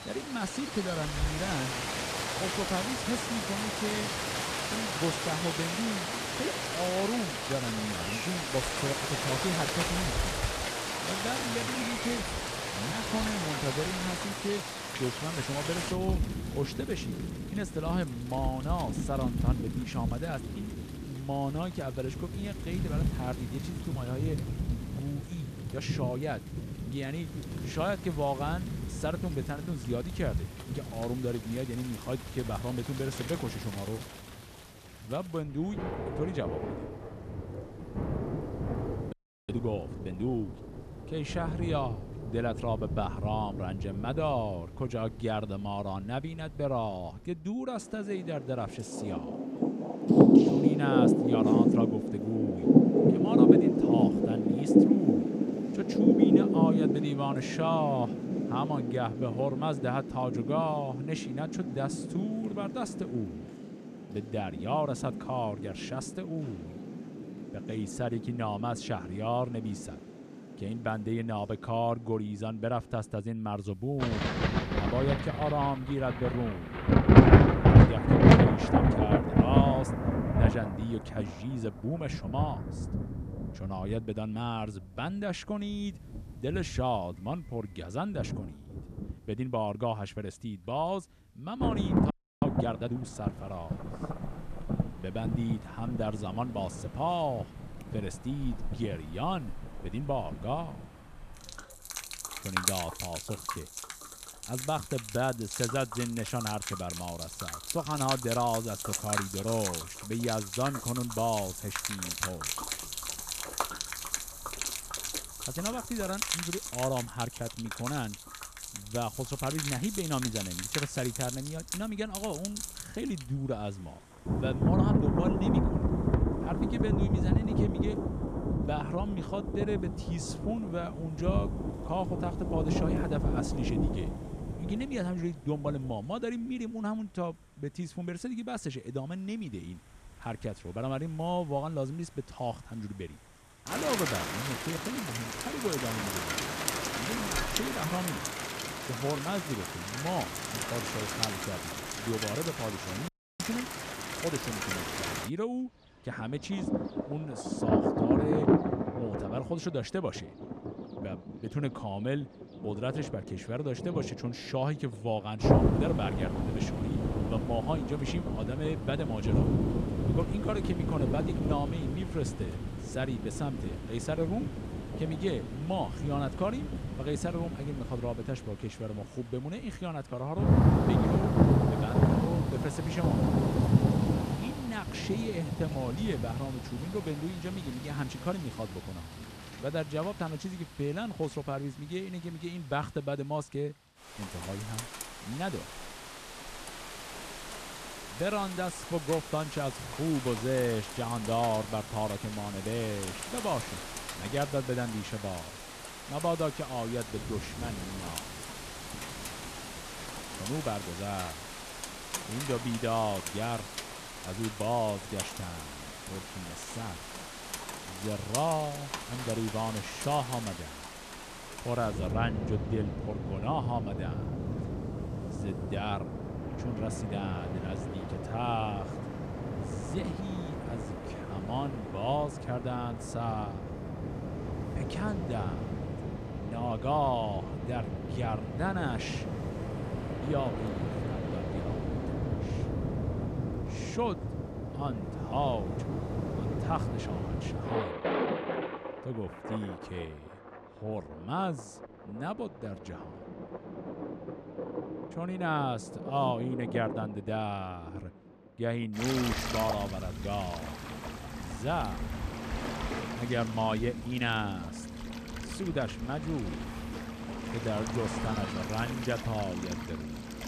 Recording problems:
rain or running water; very loud; throughout; 3 dB above the speech
audio freezing; at 39 s, at 1:32 and at 2:33

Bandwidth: 14.5 kHz